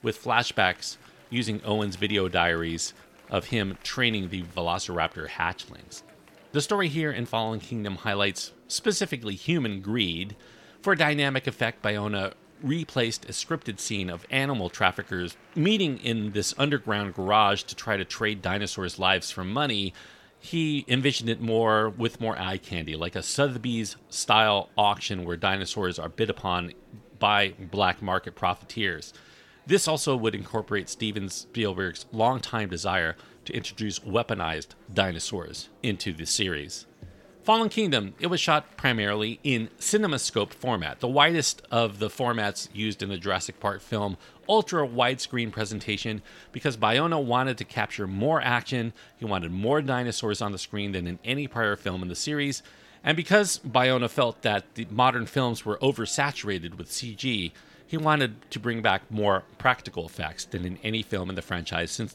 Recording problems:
murmuring crowd; faint; throughout; 30 dB below the speech

